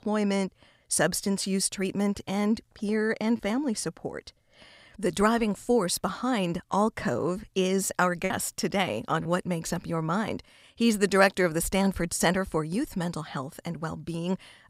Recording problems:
choppy; occasionally; from 8.5 to 9.5 s; 1% of the speech affected

